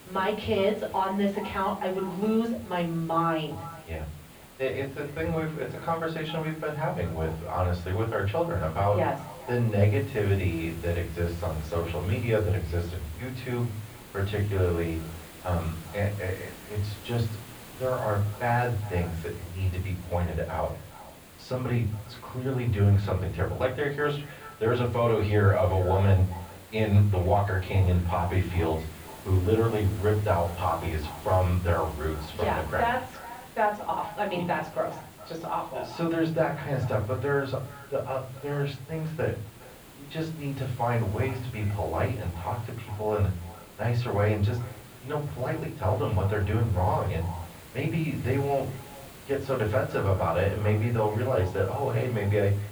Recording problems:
off-mic speech; far
muffled; very; fading above 3 kHz
echo of what is said; faint; throughout; 410 ms later, 20 dB below the speech
room echo; very slight; dies away in 0.4 s
hiss; noticeable; throughout; 20 dB below the speech

